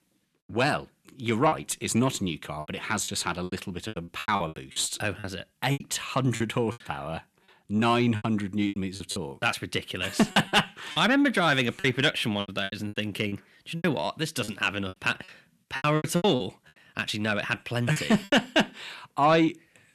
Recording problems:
distortion; slight; 10 dB below the speech
choppy; very; 12% of the speech affected

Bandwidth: 13.5 kHz